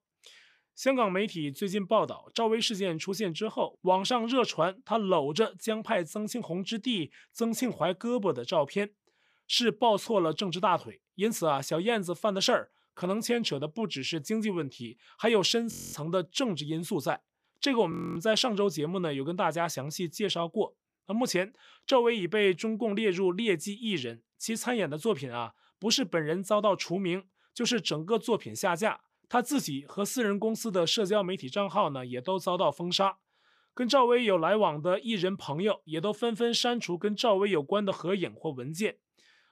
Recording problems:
audio freezing; at 16 s and at 18 s

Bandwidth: 14.5 kHz